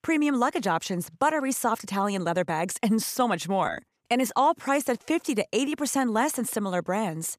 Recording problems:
none

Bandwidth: 14.5 kHz